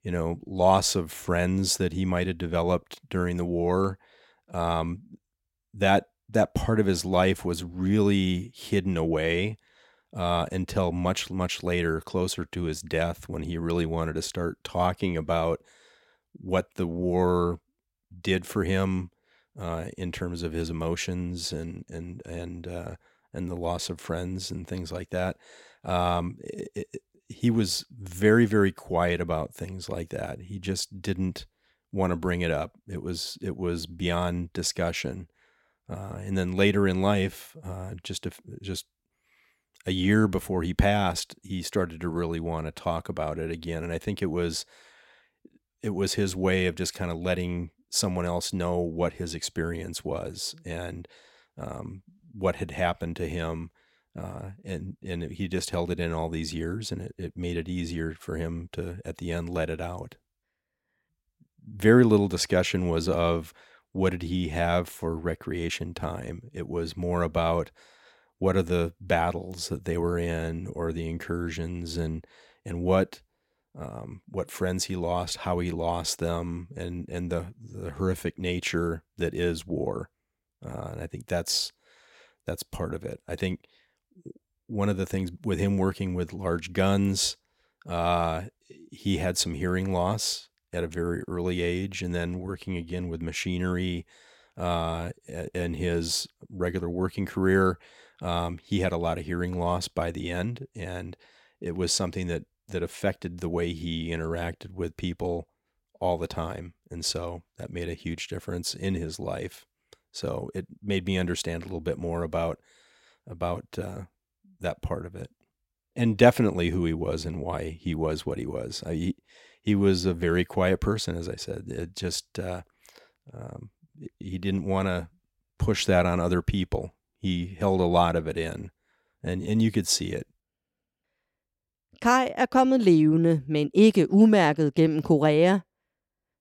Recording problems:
none

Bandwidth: 16.5 kHz